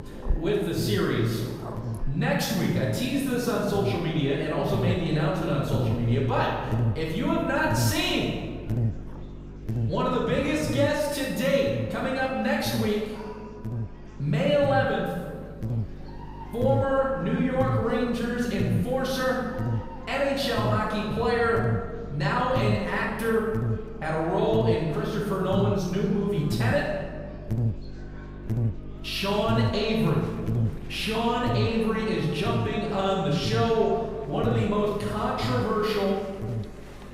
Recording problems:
room echo; strong; dies away in 1.5 s
off-mic speech; far
electrical hum; noticeable; throughout; 50 Hz, 15 dB below the speech
animal sounds; faint; throughout; 20 dB below the speech
murmuring crowd; faint; throughout; 25 dB below the speech

